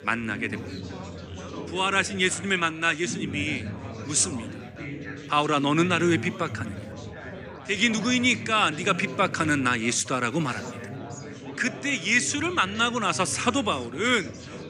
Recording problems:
chatter from many people; noticeable; throughout; 15 dB below the speech

